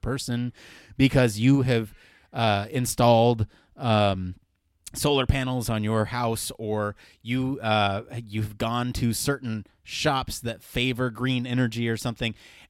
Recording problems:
none

